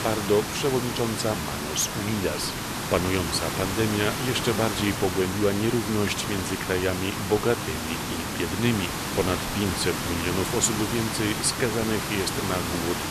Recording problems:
hiss; loud; throughout; 2 dB below the speech

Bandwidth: 14 kHz